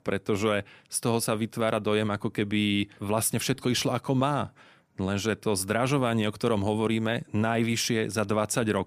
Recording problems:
none

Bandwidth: 15 kHz